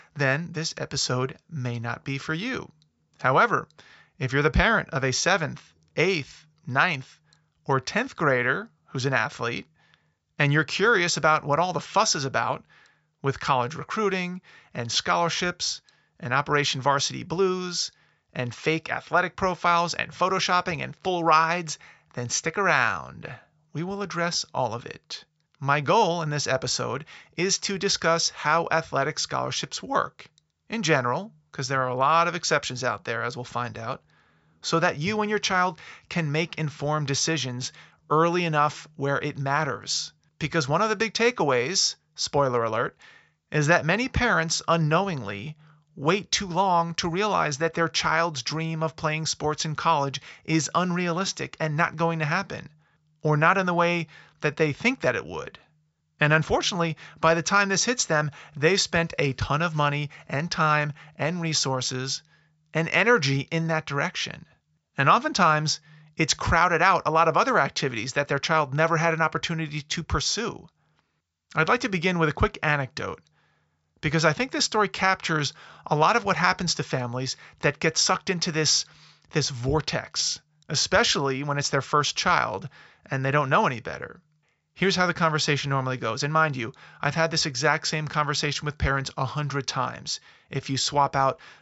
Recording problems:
high frequencies cut off; noticeable; nothing above 8 kHz

